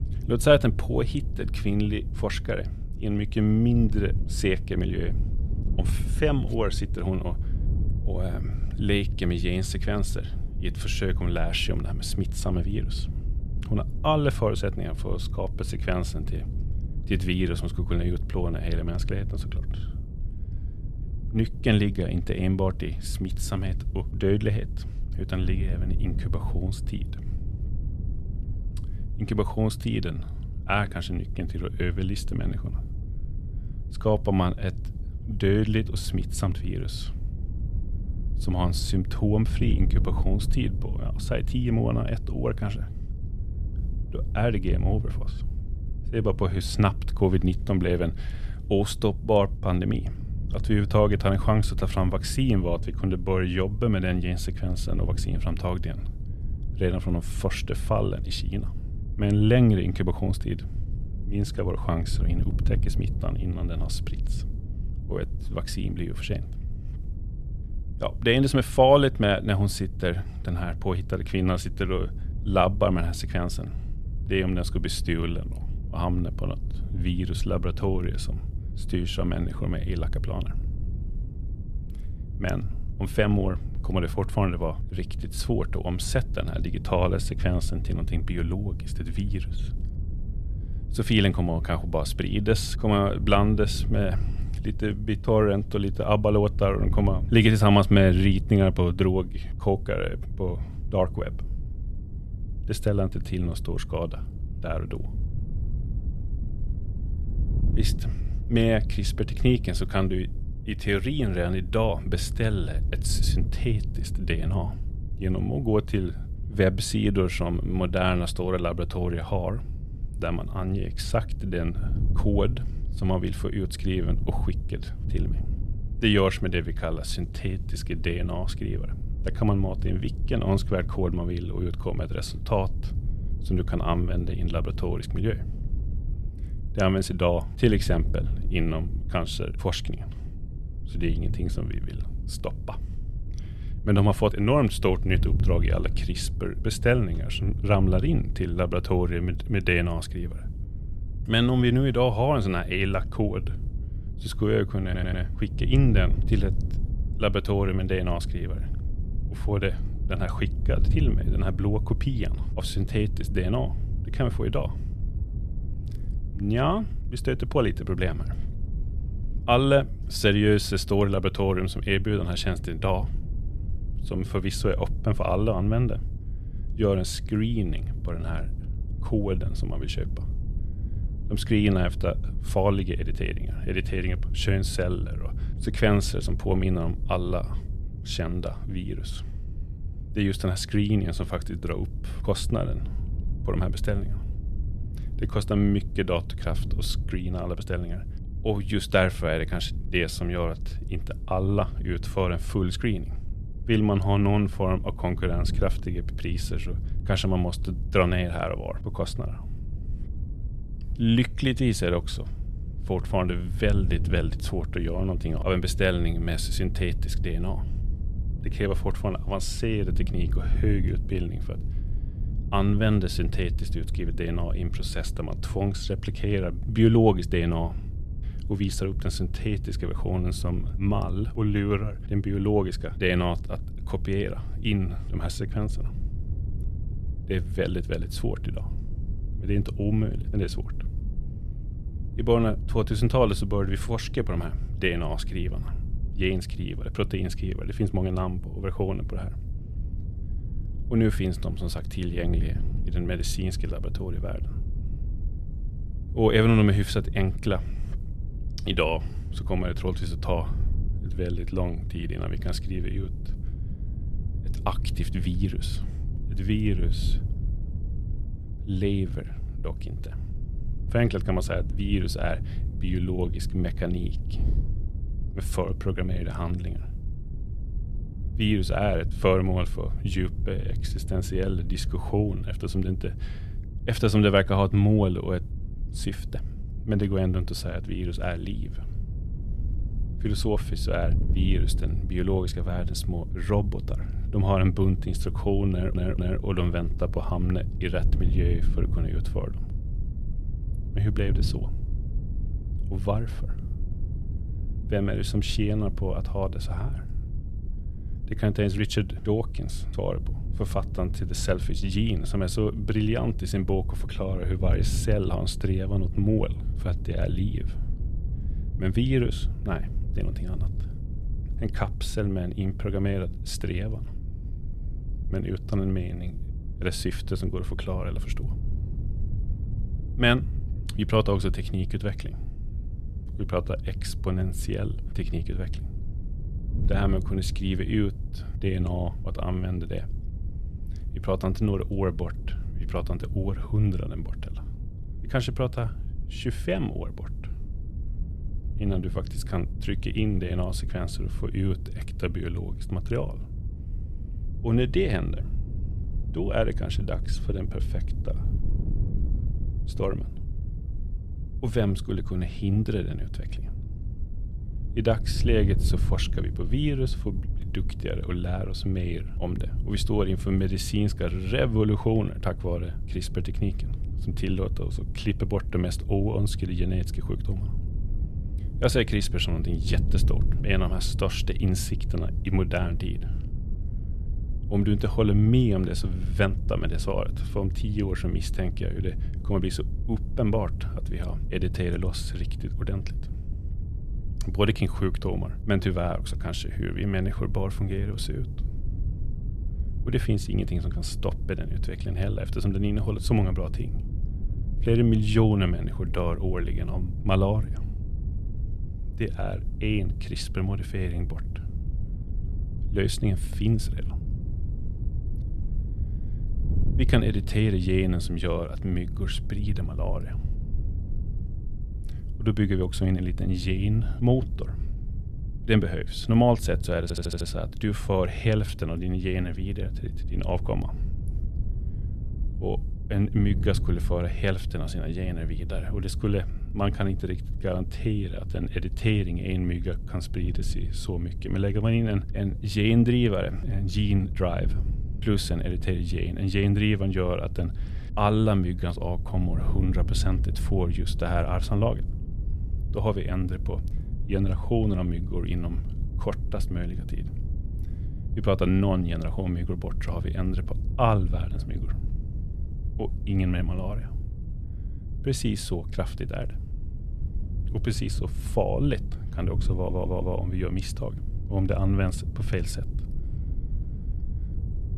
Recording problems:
wind noise on the microphone; occasional gusts; 15 dB below the speech
audio stuttering; 4 times, first at 2:35

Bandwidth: 13.5 kHz